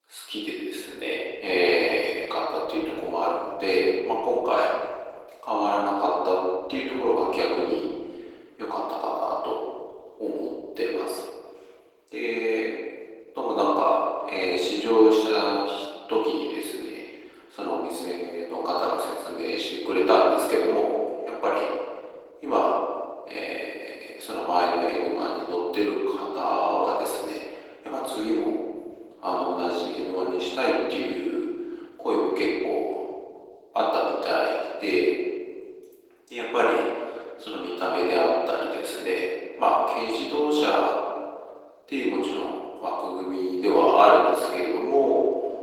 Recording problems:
off-mic speech; far
room echo; noticeable; dies away in 1.3 s
thin; somewhat; fading below 300 Hz
garbled, watery; slightly; nothing above 17.5 kHz

